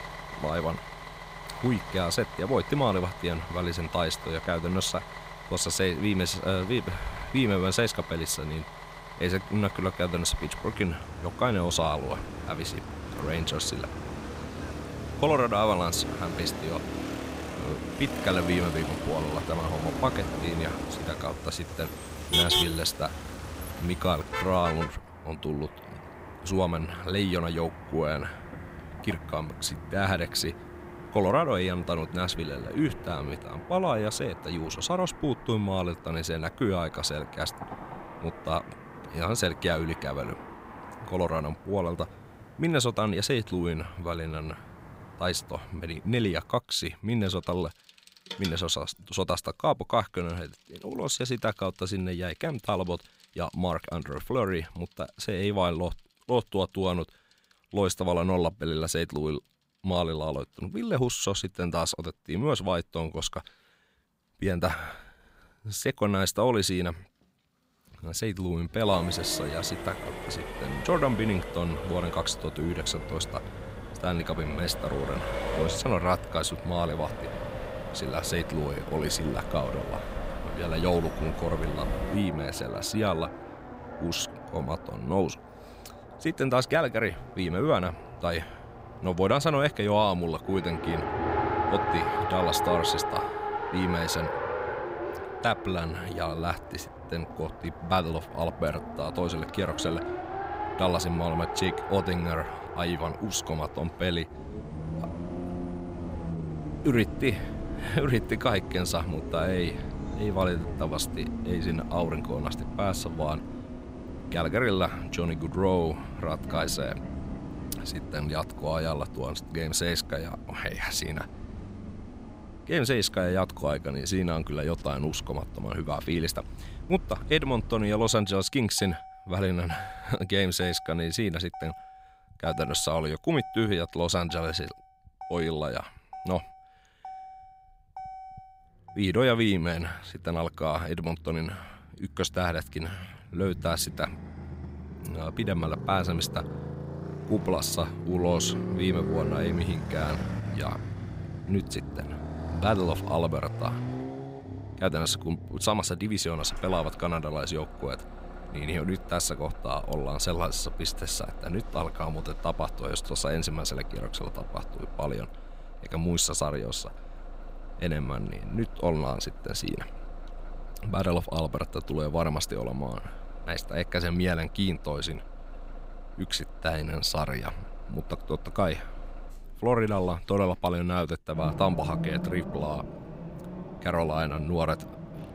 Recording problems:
traffic noise; loud; throughout; 8 dB below the speech

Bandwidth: 15.5 kHz